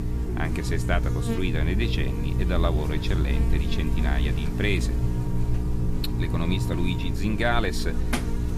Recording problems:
electrical hum; loud; throughout; 60 Hz, 6 dB below the speech
hiss; faint; throughout; 25 dB below the speech

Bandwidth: 14.5 kHz